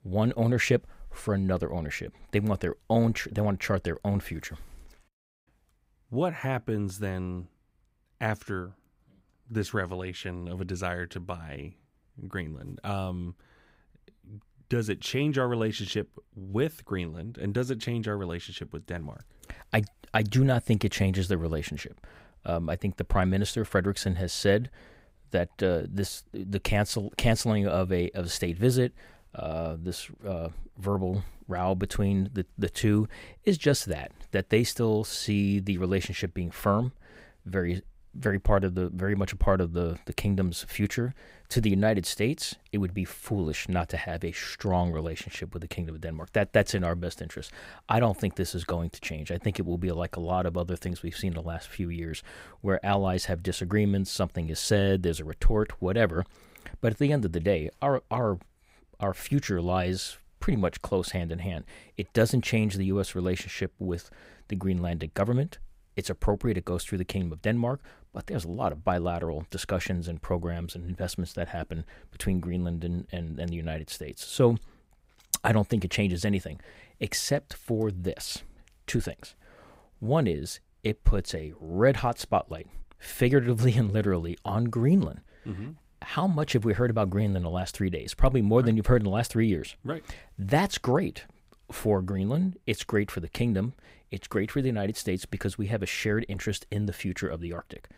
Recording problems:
none

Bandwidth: 15.5 kHz